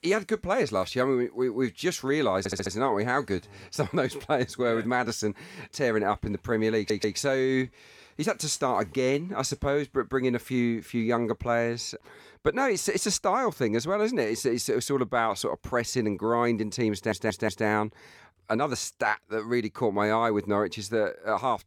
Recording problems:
audio stuttering; at 2.5 s, at 7 s and at 17 s

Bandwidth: 17.5 kHz